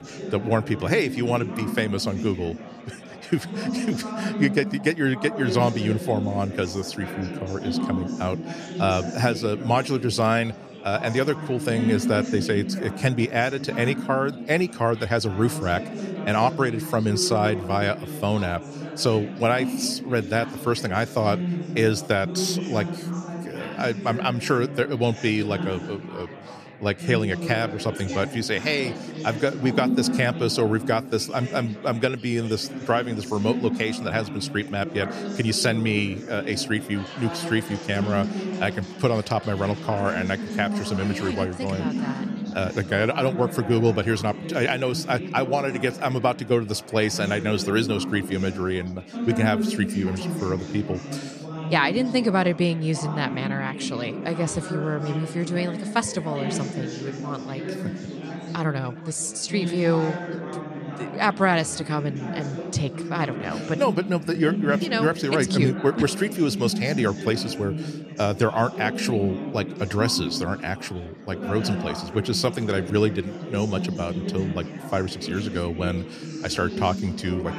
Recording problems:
chatter from many people; loud; throughout; 6 dB below the speech

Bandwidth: 14 kHz